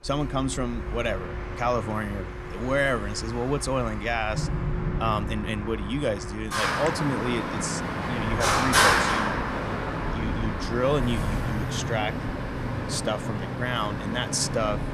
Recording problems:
traffic noise; very loud; throughout; as loud as the speech

